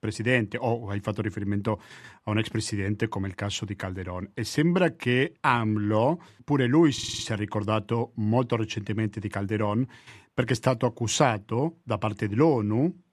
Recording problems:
audio stuttering; at 7 s

